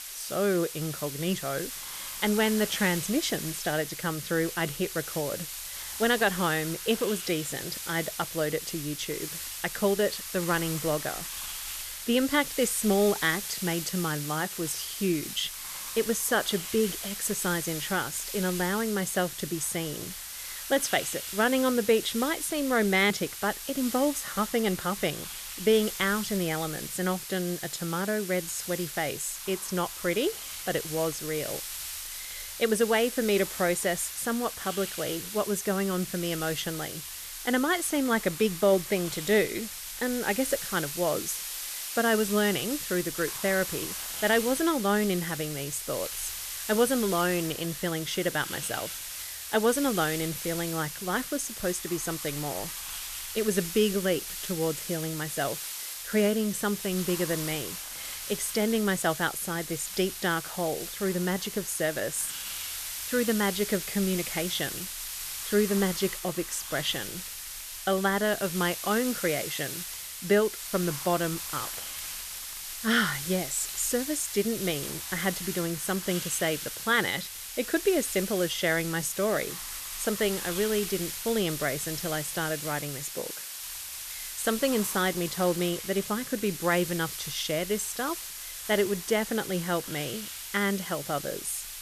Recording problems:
hiss; loud; throughout; 6 dB below the speech

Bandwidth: 14 kHz